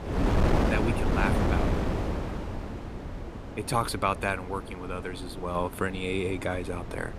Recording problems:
wind noise on the microphone; heavy; 4 dB below the speech

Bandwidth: 14.5 kHz